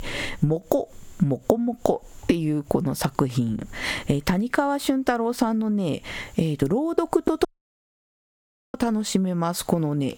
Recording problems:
squashed, flat; heavily
audio cutting out; at 7.5 s for 1.5 s

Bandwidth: 17 kHz